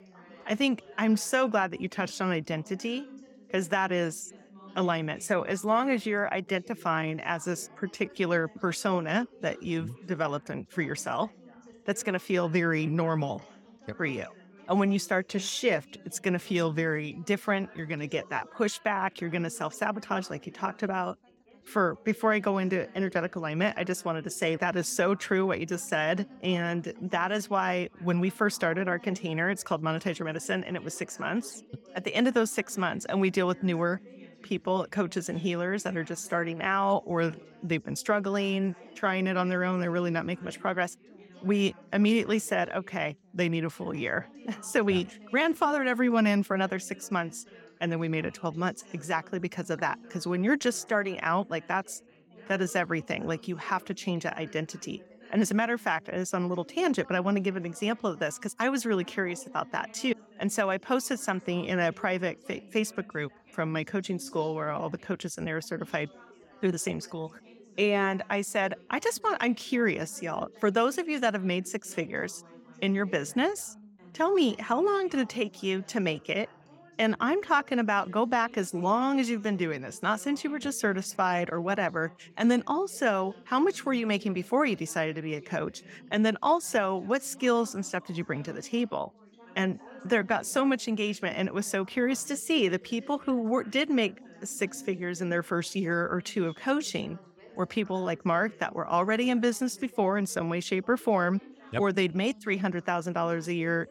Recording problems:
background chatter; faint; throughout; 4 voices, 25 dB below the speech

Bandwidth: 17 kHz